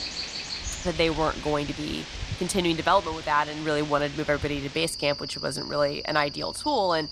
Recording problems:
animal sounds; loud; throughout; 8 dB below the speech

